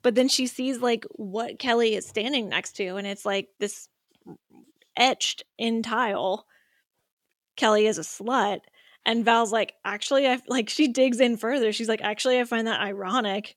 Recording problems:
none

